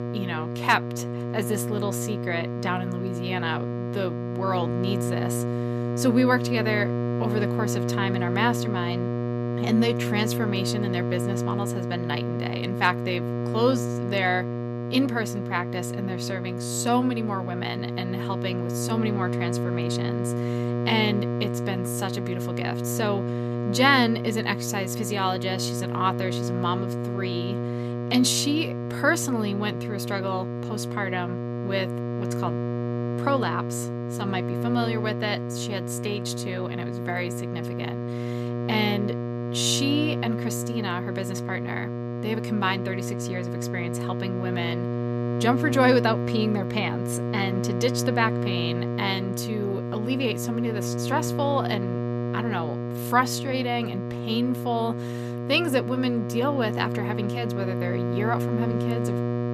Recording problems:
electrical hum; loud; throughout; 60 Hz, 6 dB below the speech

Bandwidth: 14.5 kHz